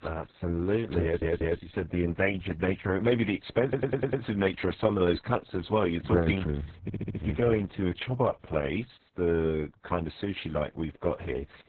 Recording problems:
garbled, watery; badly; nothing above 4 kHz
audio stuttering; at 1 s, at 3.5 s and at 7 s

